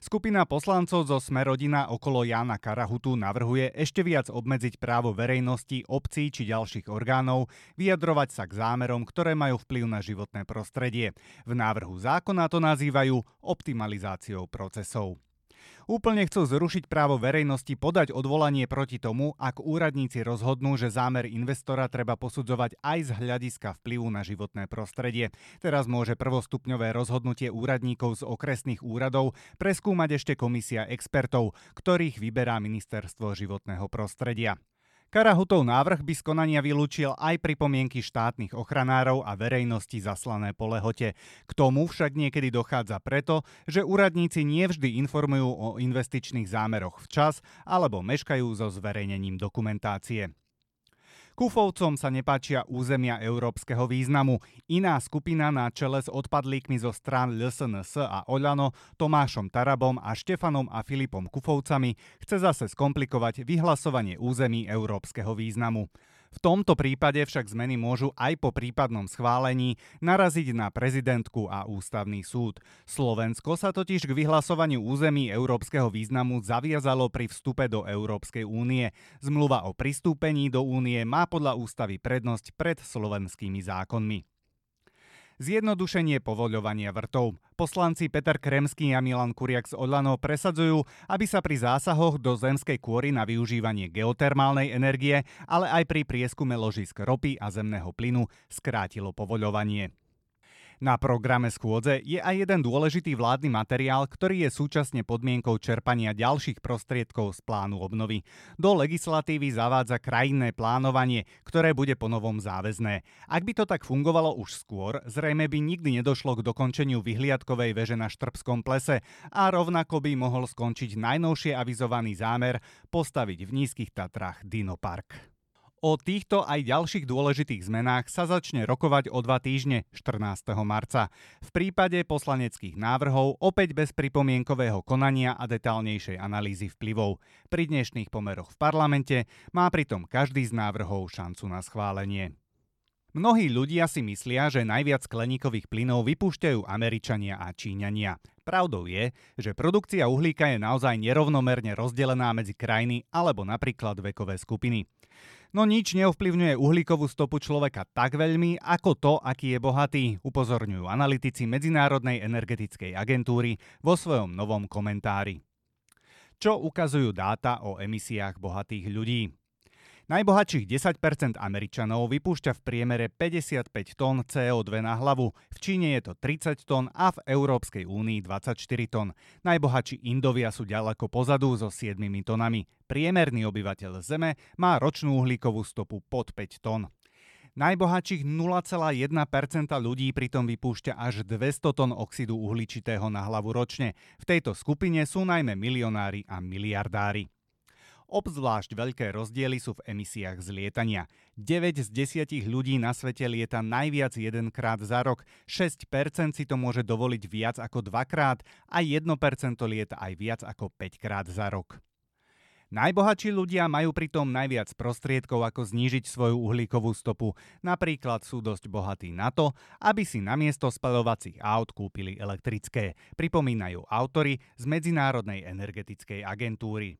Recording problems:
none

